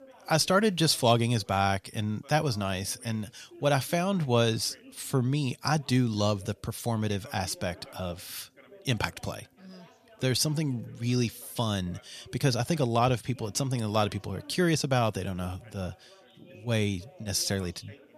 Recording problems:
background chatter; faint; throughout; 2 voices, 25 dB below the speech

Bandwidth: 14.5 kHz